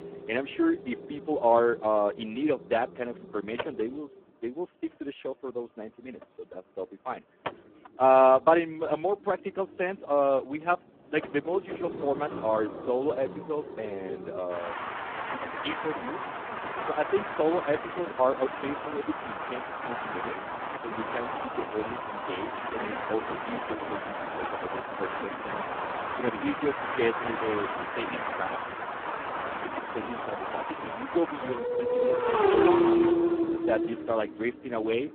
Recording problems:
phone-call audio; poor line
traffic noise; loud; throughout; 2 dB below the speech

